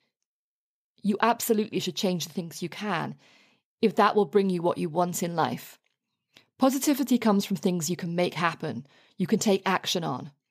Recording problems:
none

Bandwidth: 15 kHz